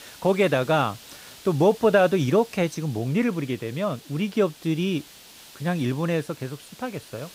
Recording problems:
hiss; faint; throughout; 20 dB below the speech

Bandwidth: 15.5 kHz